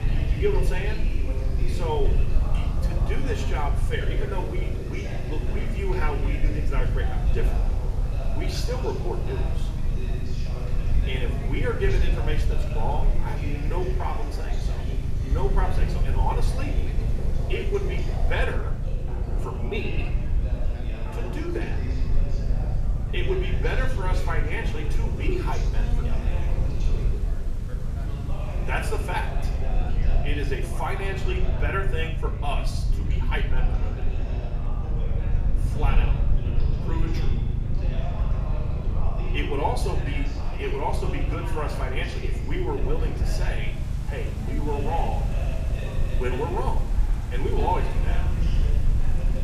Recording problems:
room echo; slight; dies away in 0.6 s
off-mic speech; somewhat distant
background chatter; loud; throughout; 3 voices, 8 dB below the speech
low rumble; noticeable; throughout; 10 dB below the speech
electrical hum; faint; from 13 to 36 s; 50 Hz, 30 dB below the speech
rain or running water; faint; throughout; 20 dB below the speech

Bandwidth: 14.5 kHz